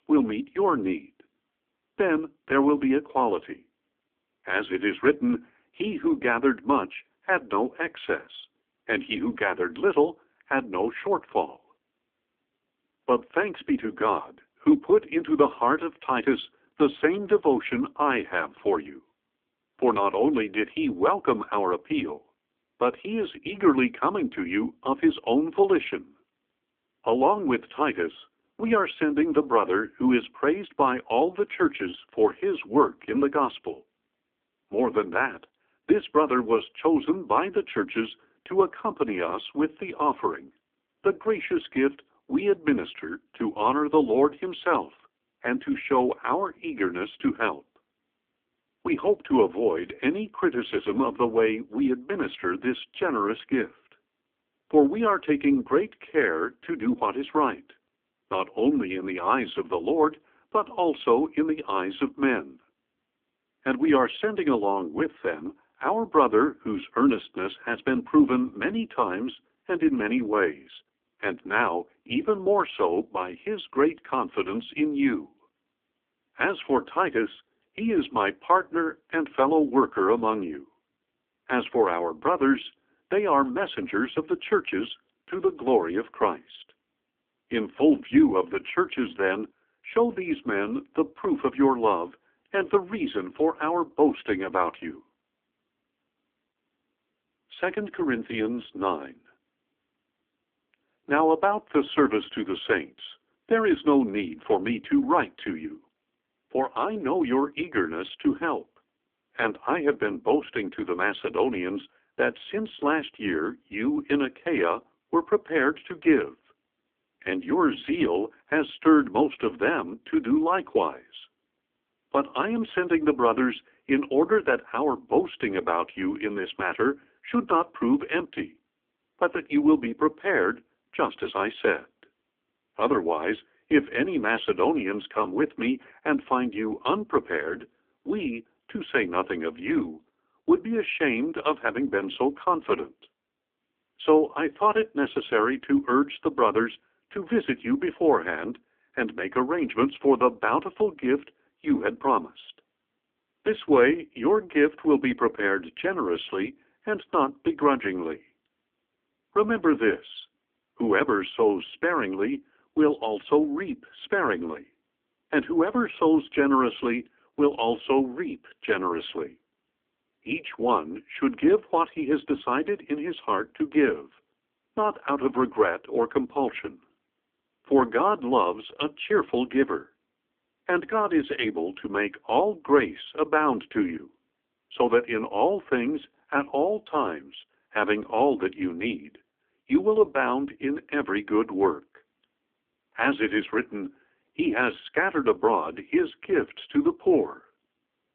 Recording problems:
phone-call audio; poor line; nothing above 3.5 kHz

